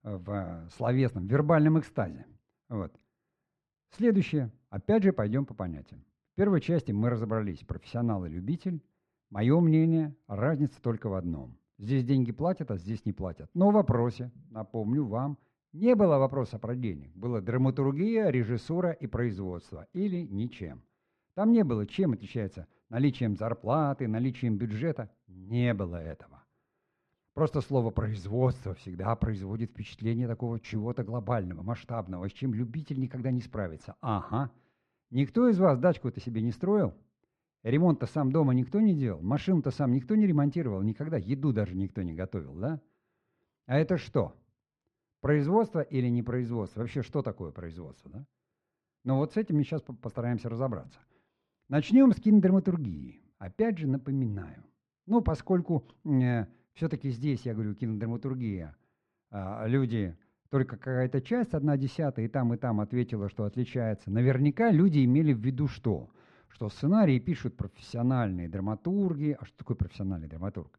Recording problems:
muffled; very; fading above 2 kHz

